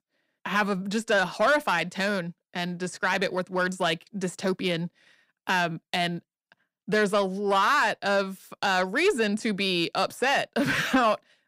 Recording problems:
distortion; slight; 10 dB below the speech

